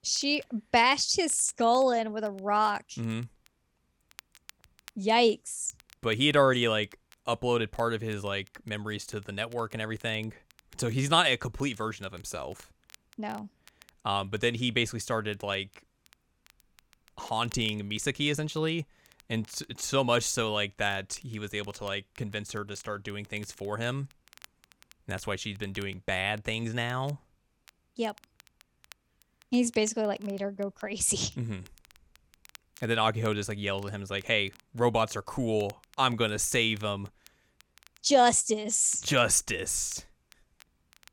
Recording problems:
crackle, like an old record; faint; 30 dB below the speech

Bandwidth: 17 kHz